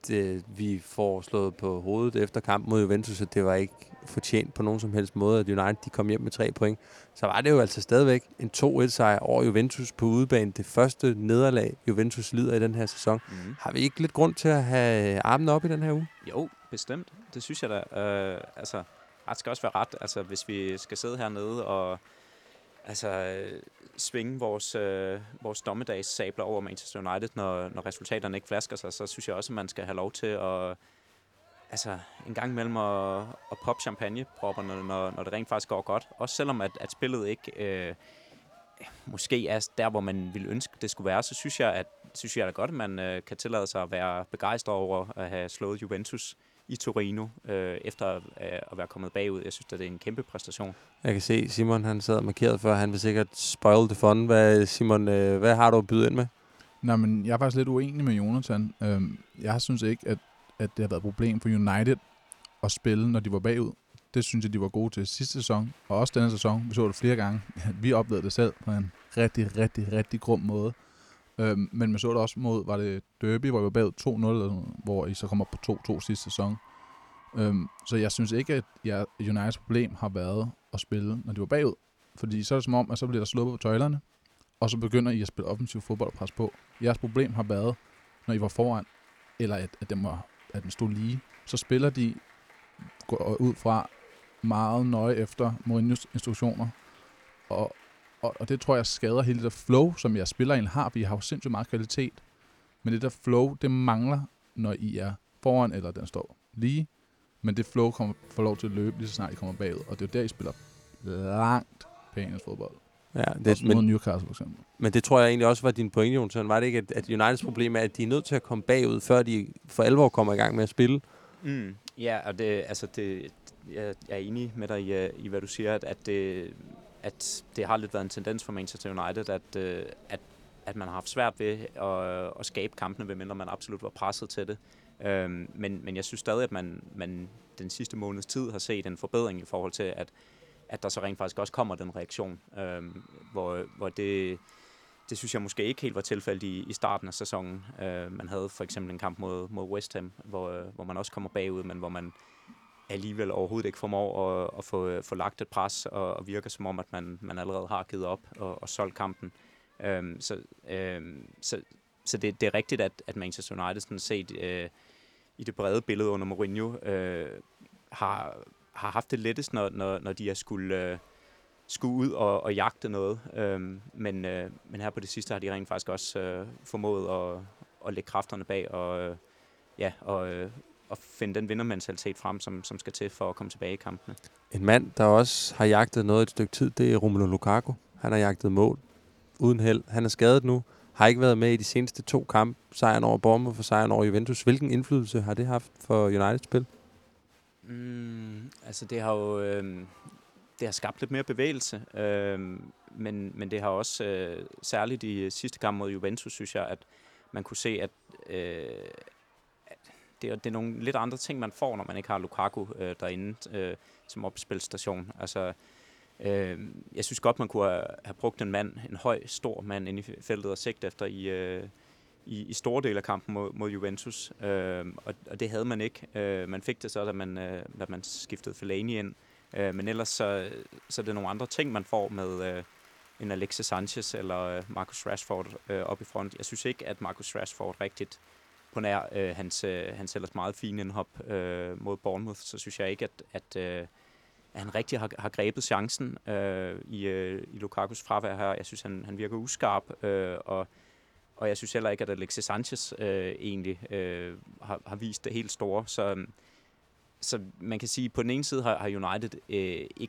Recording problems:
crowd noise; faint; throughout; 30 dB below the speech

